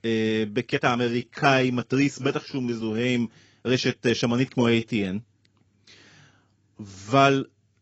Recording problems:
garbled, watery; badly; nothing above 7.5 kHz
uneven, jittery; strongly; from 0.5 to 7 s

